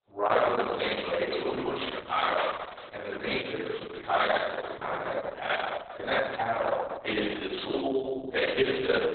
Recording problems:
room echo; strong; dies away in 1.3 s
off-mic speech; far
garbled, watery; badly; nothing above 4 kHz
thin; somewhat; fading below 450 Hz

